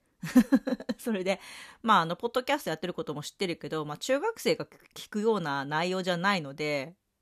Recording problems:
none

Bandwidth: 14 kHz